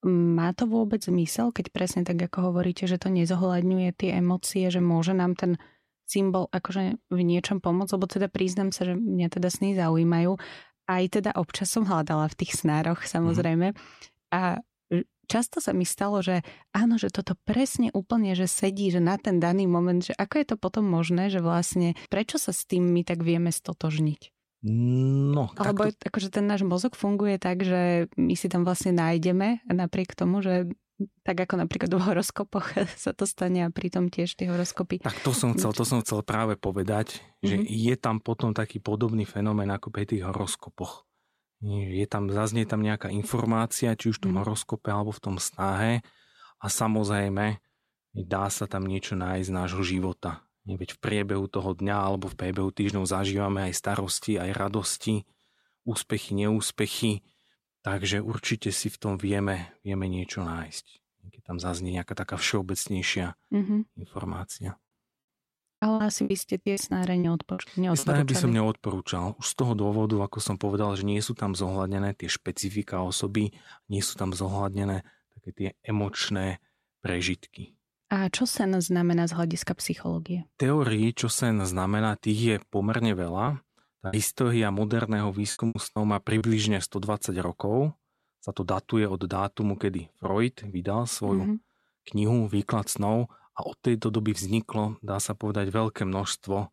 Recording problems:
choppy; very; from 1:06 to 1:08 and from 1:23 to 1:26; 13% of the speech affected

